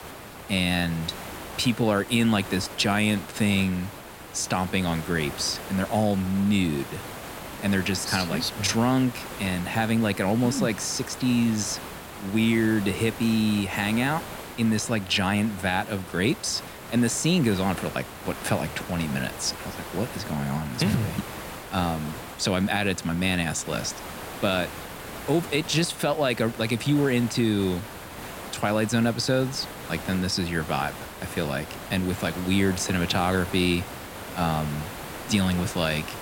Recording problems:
hiss; noticeable; throughout; 10 dB below the speech

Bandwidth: 16.5 kHz